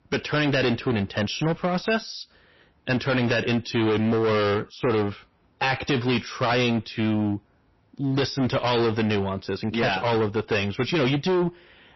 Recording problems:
distortion; heavy; 19% of the sound clipped
garbled, watery; slightly; nothing above 5.5 kHz

